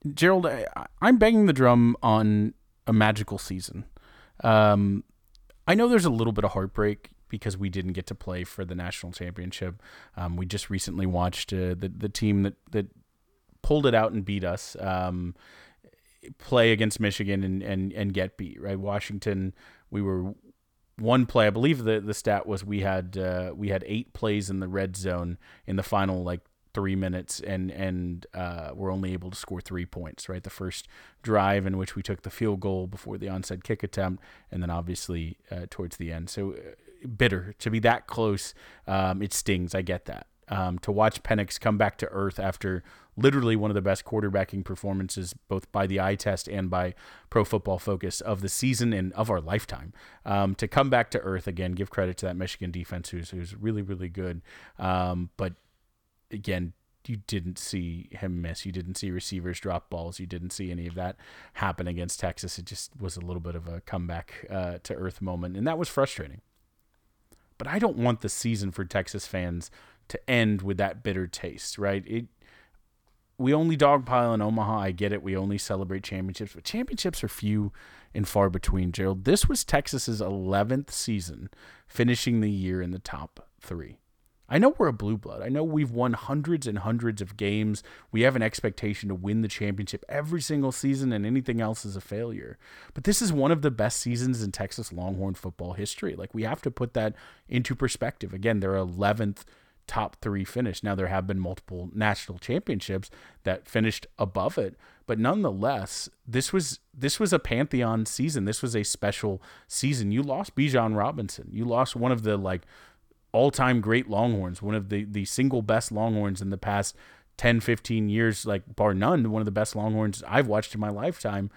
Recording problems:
none

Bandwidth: 18.5 kHz